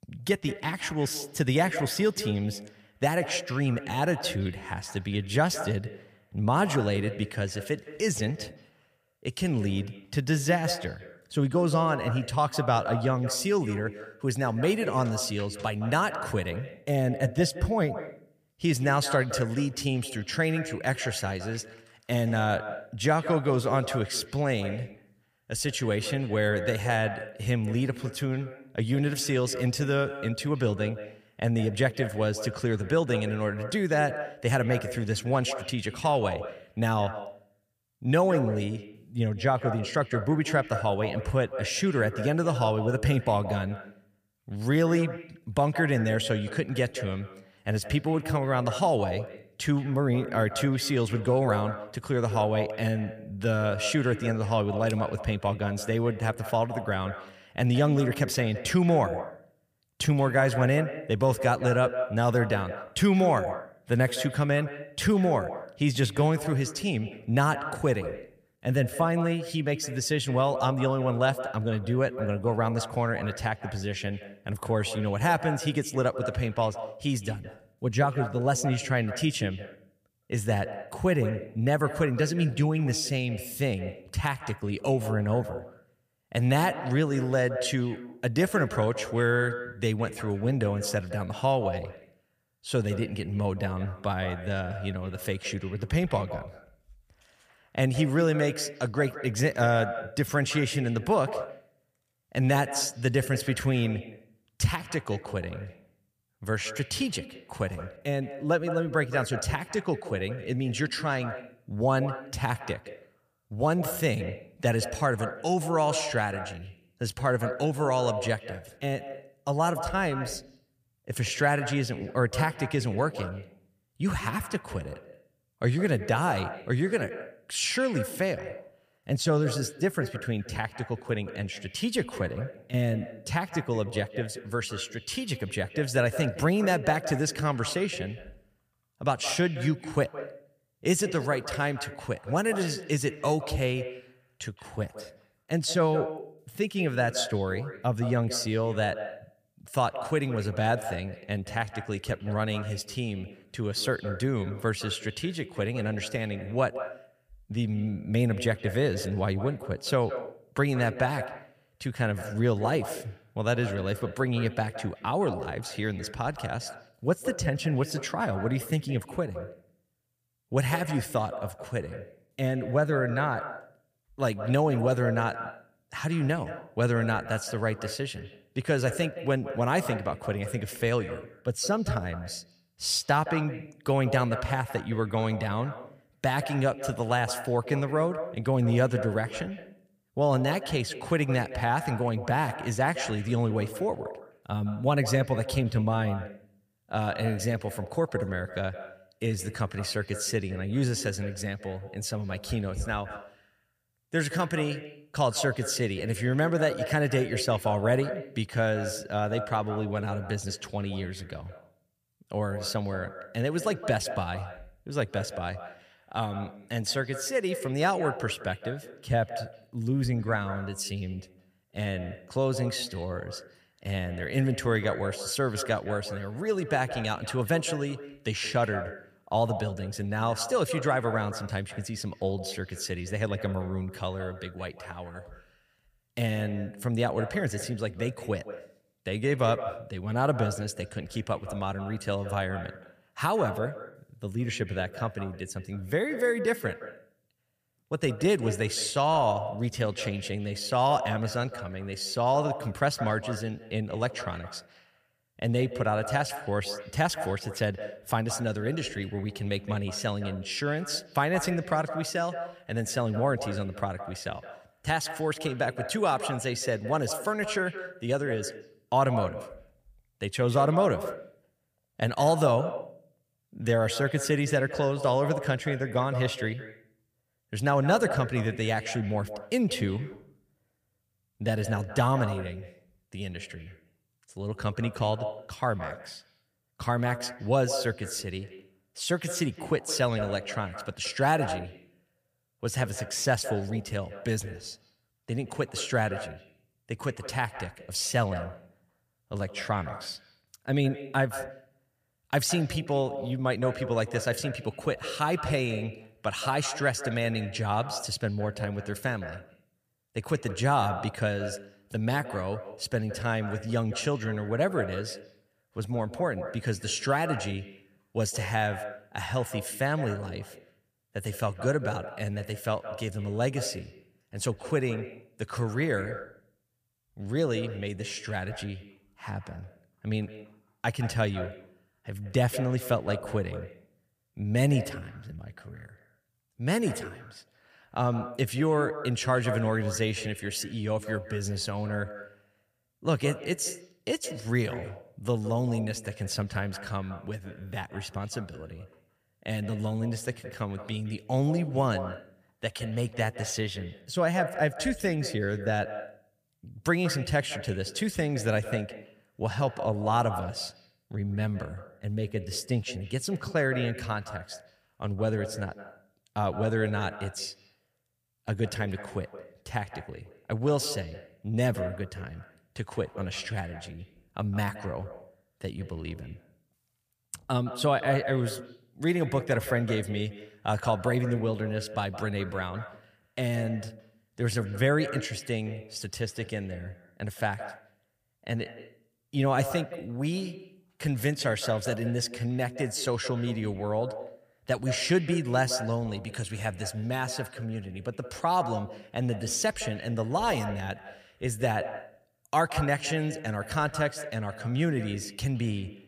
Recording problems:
echo of what is said; strong; throughout; 170 ms later, 10 dB below the speech

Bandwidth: 15 kHz